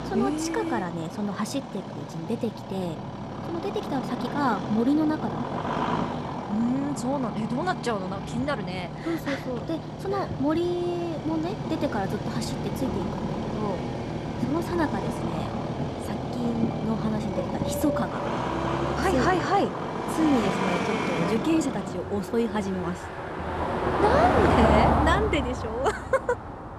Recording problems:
traffic noise; loud; throughout; 1 dB below the speech

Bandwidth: 14 kHz